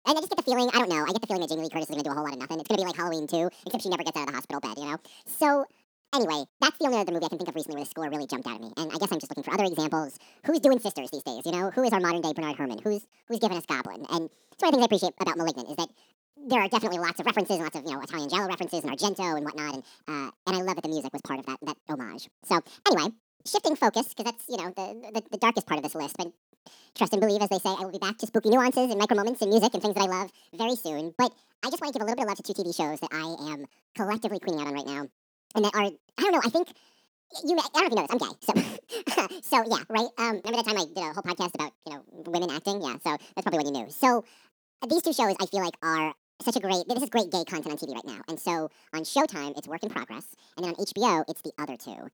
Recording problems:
wrong speed and pitch; too fast and too high; 1.7 times normal speed

